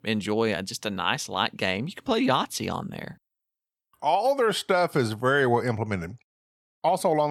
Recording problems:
abrupt cut into speech; at the end

